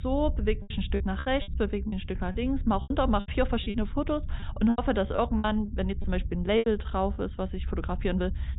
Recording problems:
high frequencies cut off; severe; nothing above 4 kHz
low rumble; faint; throughout; 25 dB below the speech
choppy; very; 11% of the speech affected

